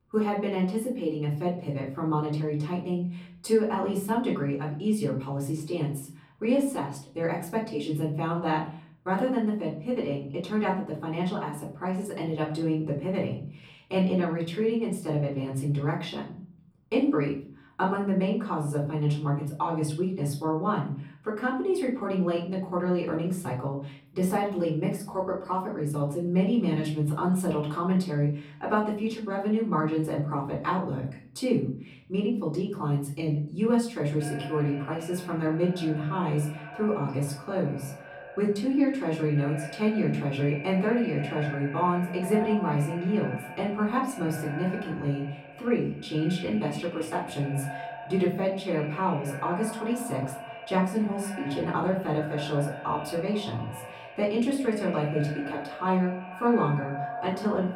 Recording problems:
off-mic speech; far
echo of what is said; noticeable; from 34 s on; 160 ms later, 10 dB below the speech
room echo; slight; dies away in 0.4 s

